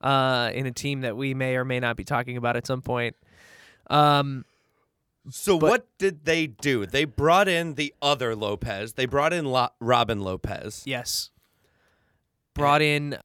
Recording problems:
none

